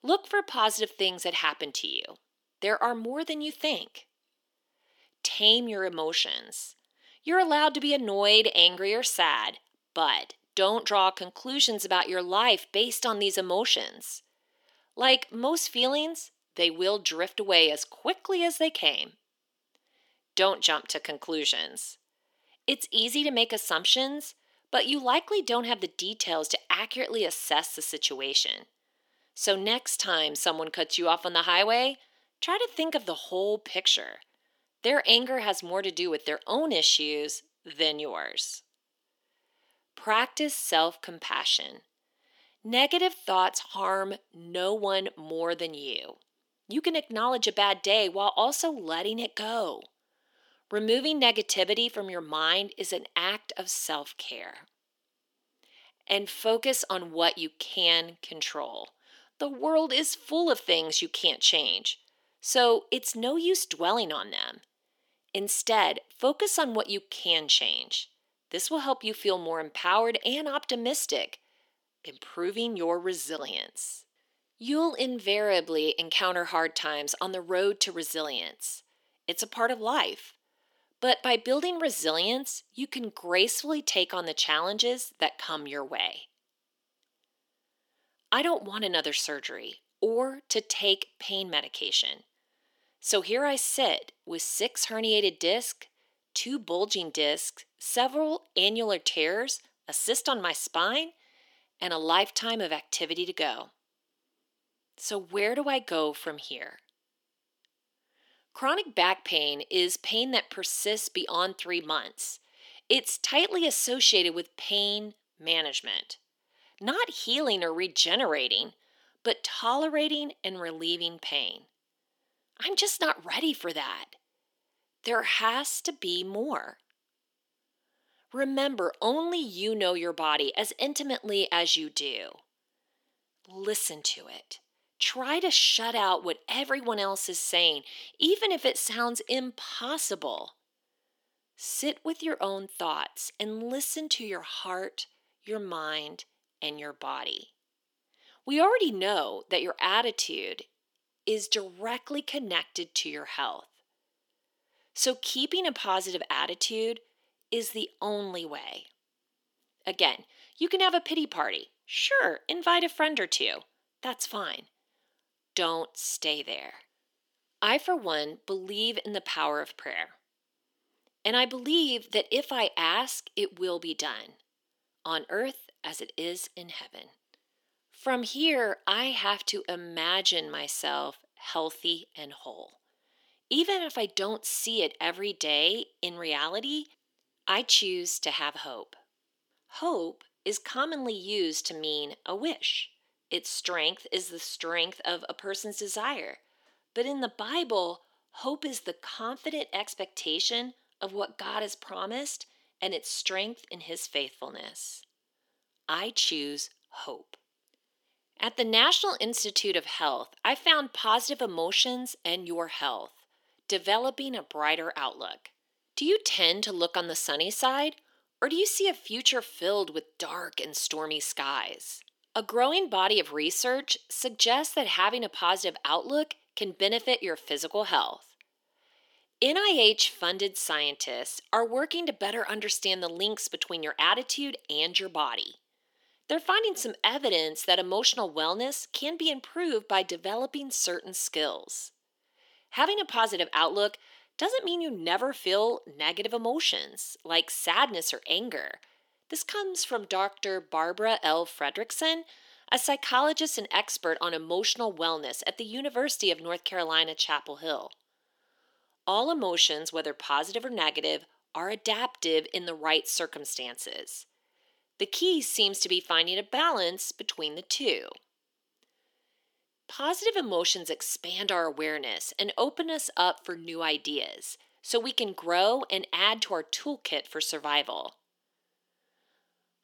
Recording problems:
thin; somewhat; fading below 300 Hz

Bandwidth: 18.5 kHz